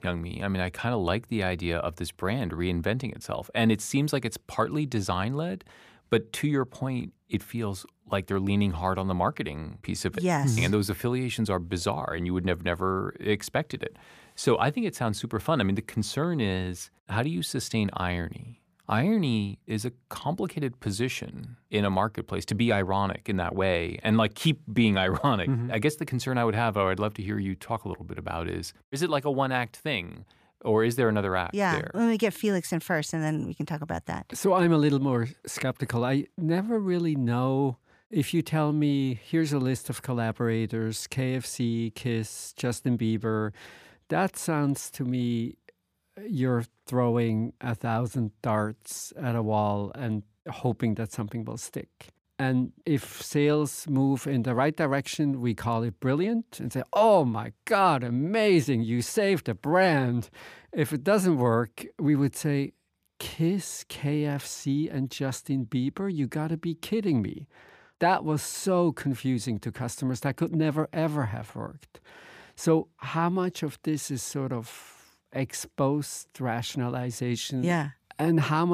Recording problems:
abrupt cut into speech; at the end

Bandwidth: 15 kHz